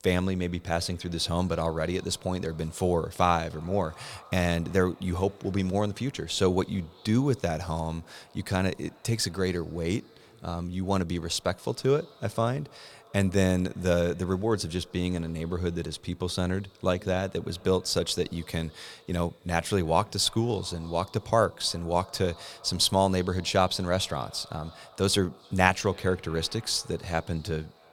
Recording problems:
echo of what is said; faint; throughout; 310 ms later, 25 dB below the speech

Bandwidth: 19 kHz